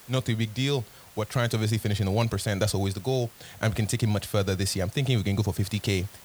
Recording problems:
hiss; faint; throughout; 20 dB below the speech

